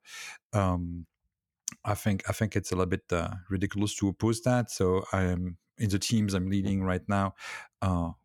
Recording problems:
none

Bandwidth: 18.5 kHz